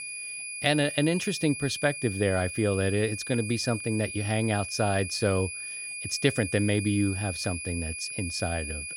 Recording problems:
high-pitched whine; loud; throughout; 2.5 kHz, 6 dB below the speech

